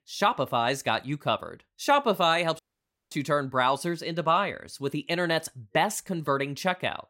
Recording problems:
audio cutting out; at 2.5 s for 0.5 s

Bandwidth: 16 kHz